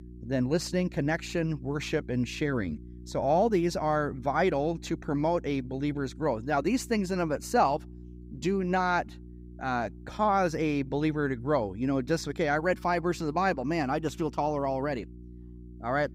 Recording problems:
electrical hum; faint; throughout; 60 Hz, 25 dB below the speech

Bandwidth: 15.5 kHz